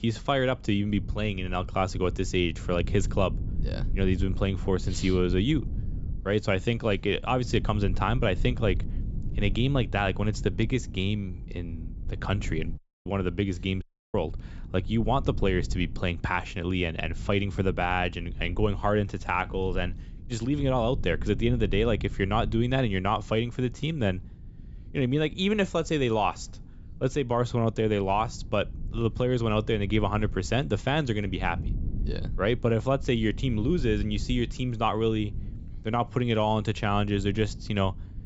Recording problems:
high frequencies cut off; noticeable; nothing above 8 kHz
low rumble; faint; throughout; 20 dB below the speech
audio cutting out; at 13 s and at 14 s

